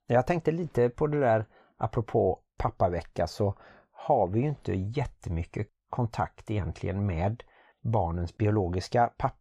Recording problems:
none

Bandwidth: 15 kHz